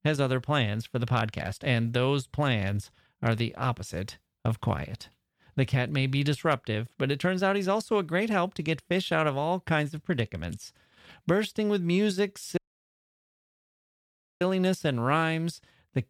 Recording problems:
audio cutting out; at 13 s for 2 s

